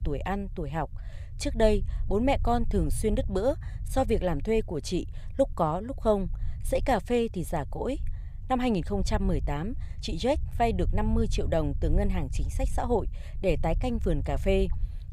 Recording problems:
low rumble; faint; throughout; 25 dB below the speech

